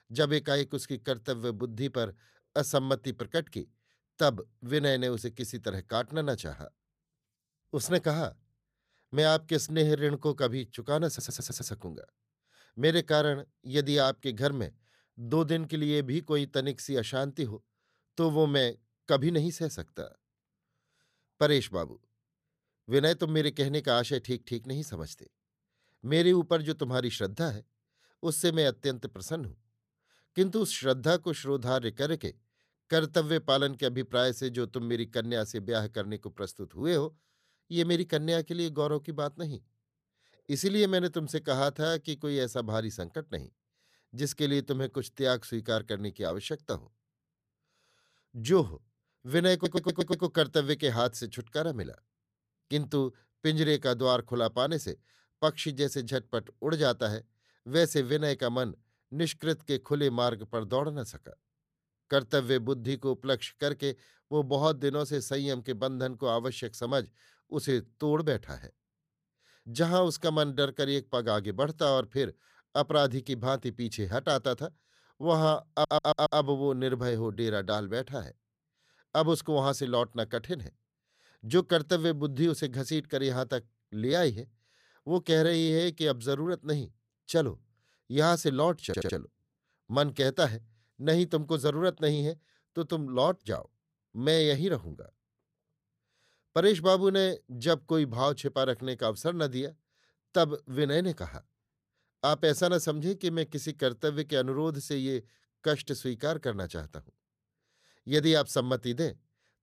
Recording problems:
audio stuttering; 4 times, first at 11 s

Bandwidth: 14.5 kHz